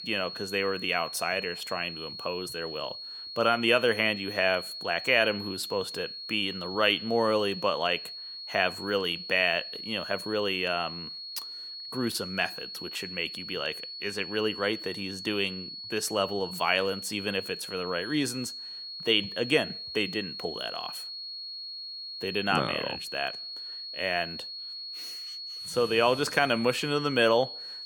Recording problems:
high-pitched whine; loud; throughout; 4.5 kHz, 8 dB below the speech

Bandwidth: 18 kHz